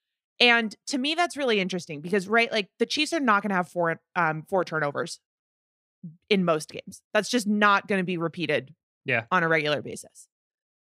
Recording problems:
none

